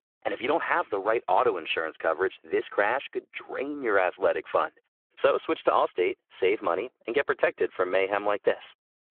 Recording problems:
phone-call audio

